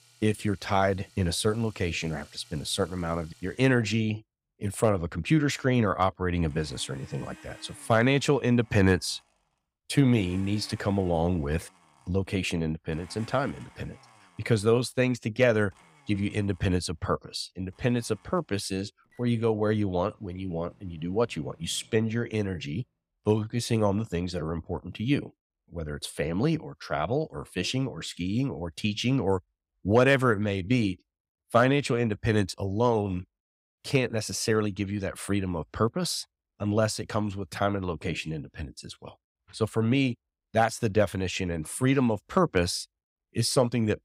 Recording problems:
household noises; faint; until 22 s; 25 dB below the speech

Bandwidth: 15.5 kHz